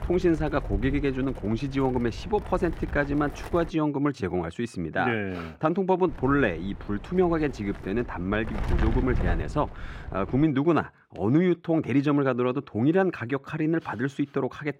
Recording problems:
muffled; slightly; fading above 3.5 kHz
wind noise on the microphone; occasional gusts; until 3.5 s and from 6 to 10 s; 15 dB below the speech

